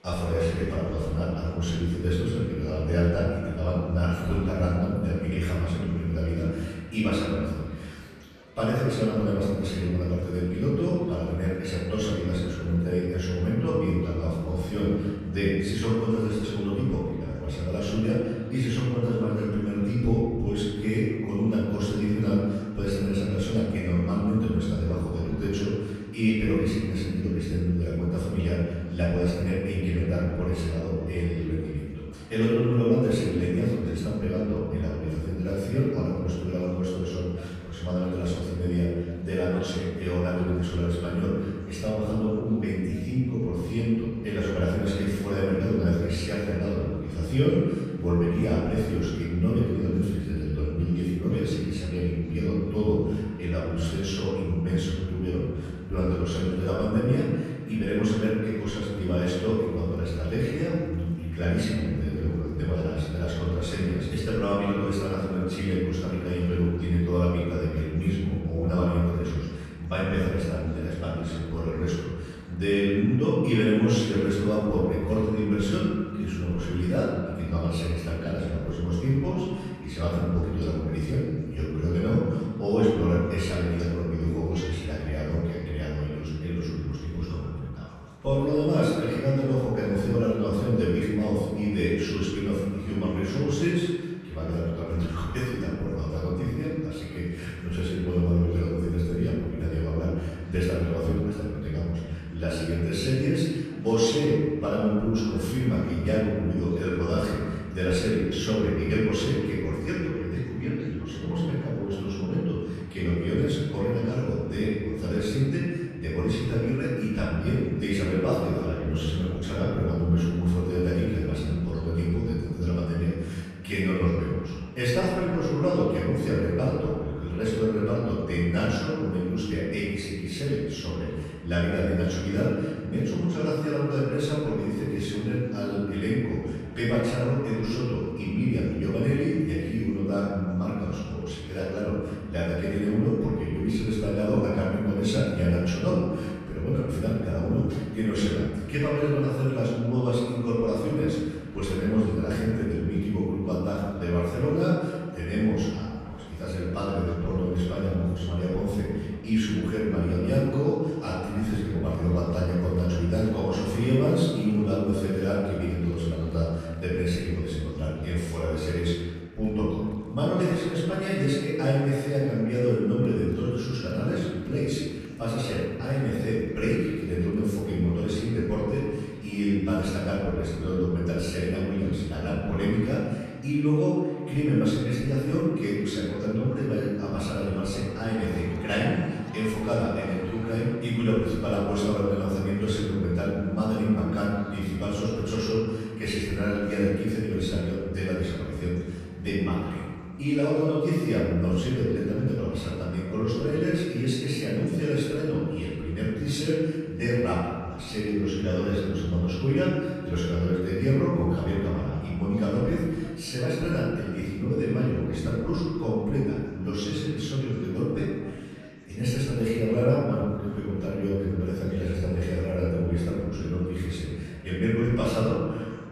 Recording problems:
room echo; strong; dies away in 1.6 s
off-mic speech; far
murmuring crowd; faint; throughout; 25 dB below the speech

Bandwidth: 14.5 kHz